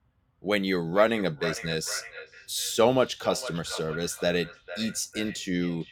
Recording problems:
echo of what is said; noticeable; throughout; 450 ms later, 10 dB below the speech

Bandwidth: 17.5 kHz